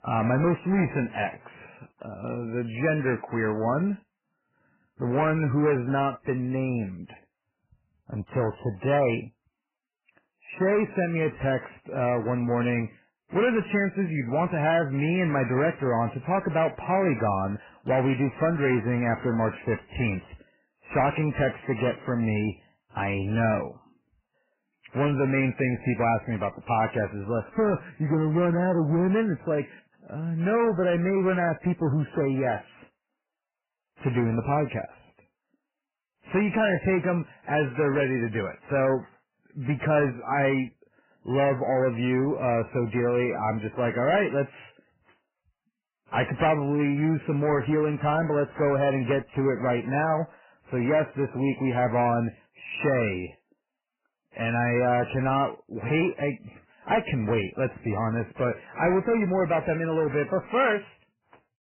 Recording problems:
garbled, watery; badly; nothing above 3 kHz
distortion; slight; 10 dB below the speech

